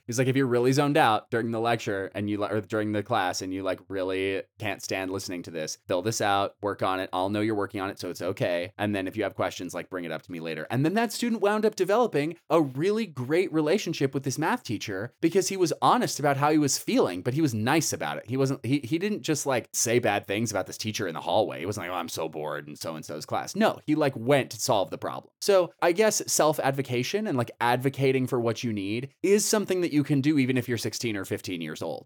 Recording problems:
none

